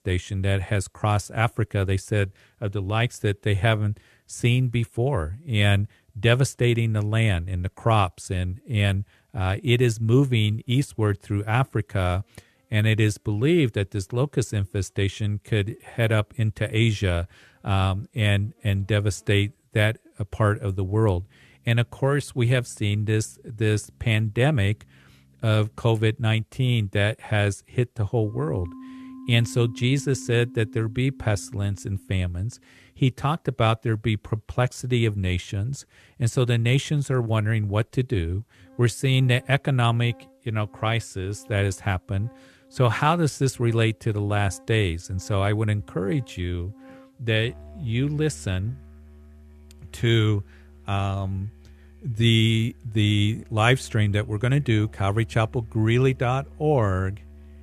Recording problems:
background music; faint; throughout; 25 dB below the speech

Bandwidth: 13.5 kHz